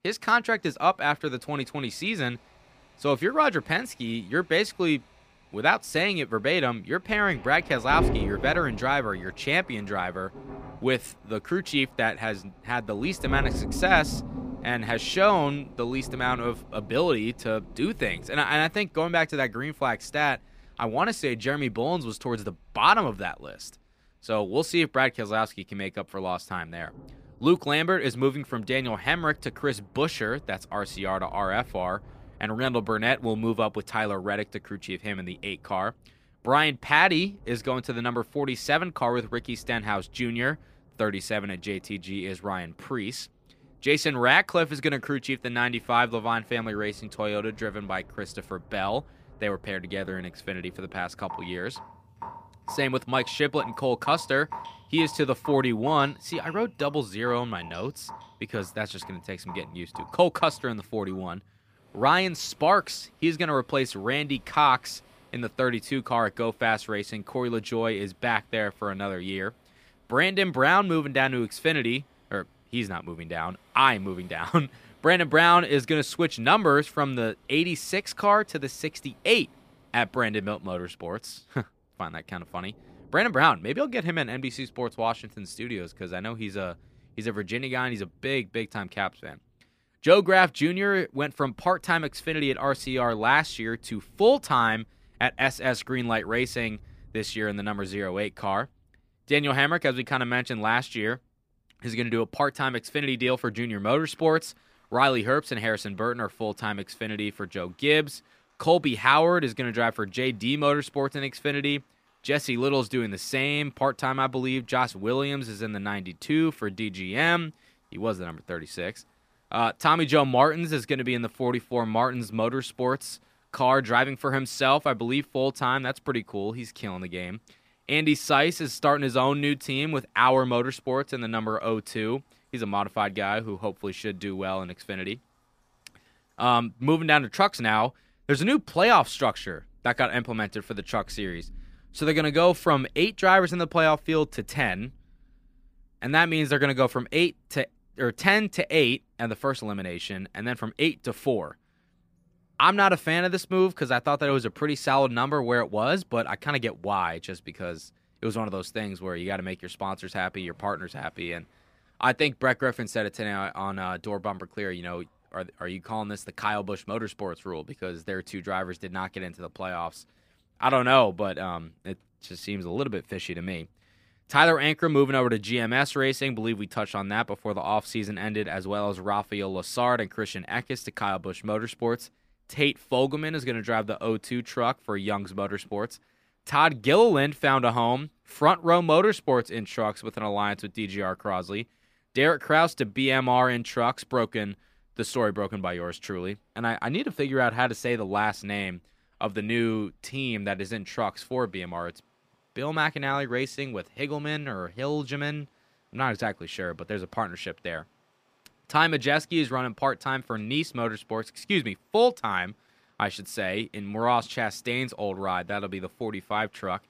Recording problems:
rain or running water; noticeable; throughout; 15 dB below the speech

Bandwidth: 15 kHz